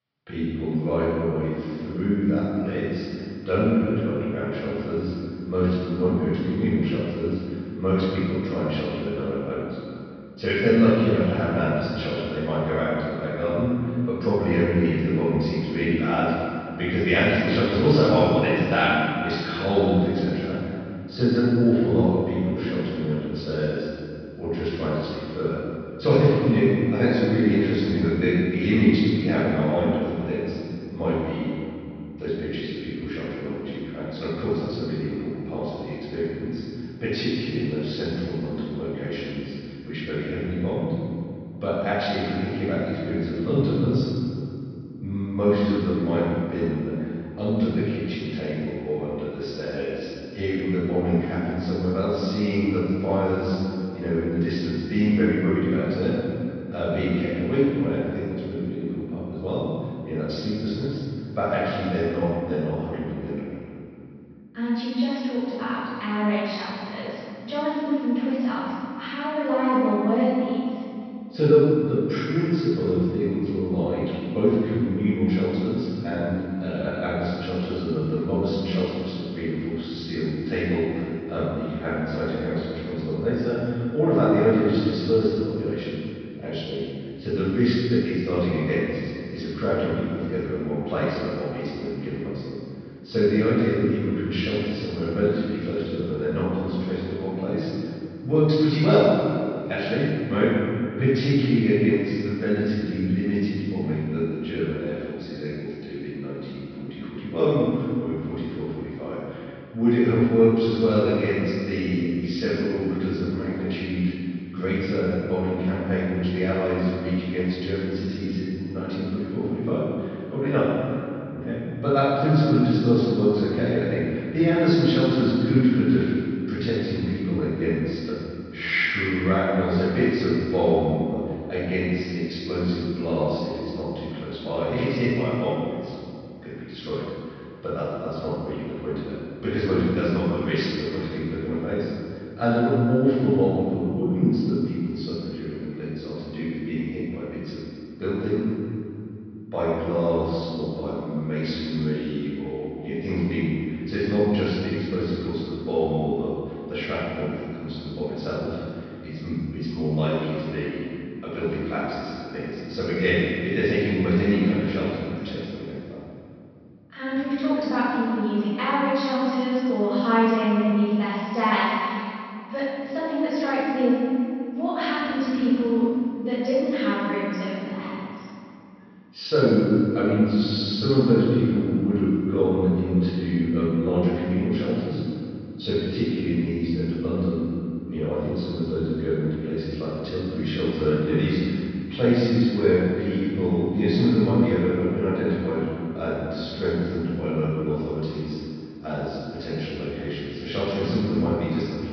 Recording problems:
room echo; strong; dies away in 2.6 s
off-mic speech; far
high frequencies cut off; noticeable; nothing above 5.5 kHz

